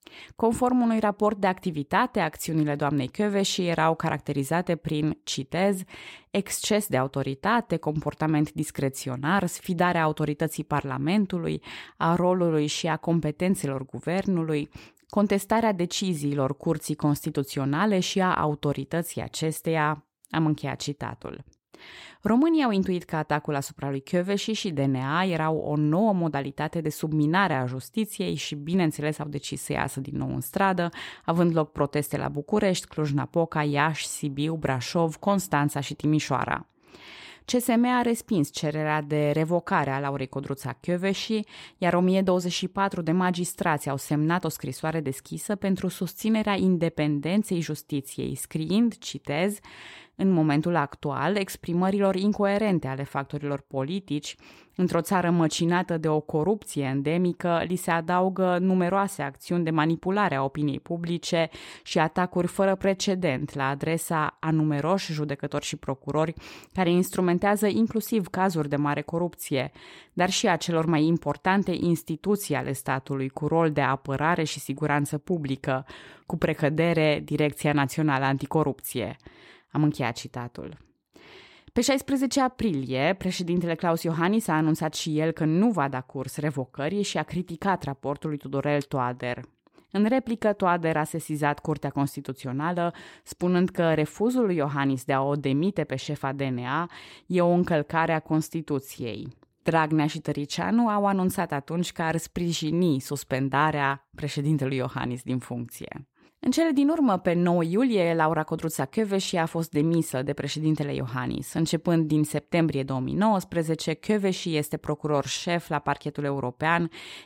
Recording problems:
none

